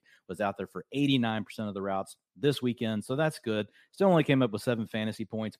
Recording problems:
none

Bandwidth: 14.5 kHz